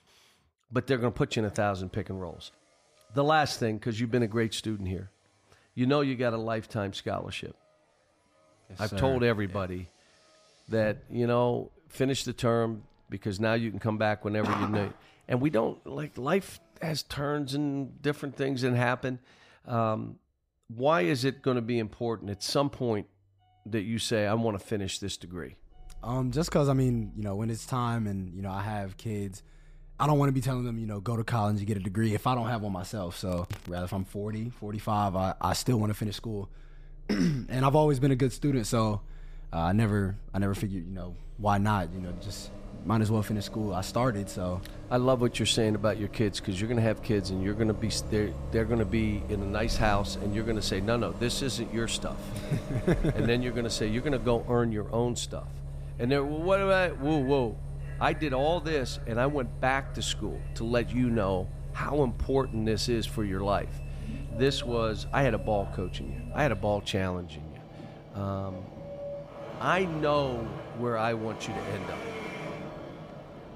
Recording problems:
traffic noise; noticeable; throughout; 10 dB below the speech

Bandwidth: 15 kHz